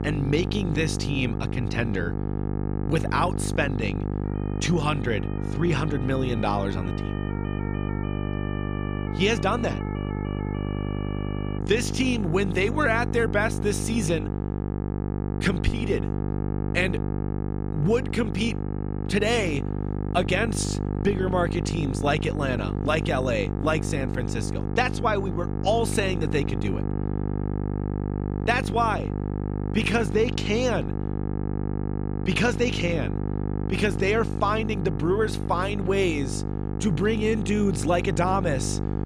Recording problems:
electrical hum; loud; throughout; 50 Hz, 9 dB below the speech
siren; faint; from 4.5 to 12 s; peak 15 dB below the speech

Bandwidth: 15 kHz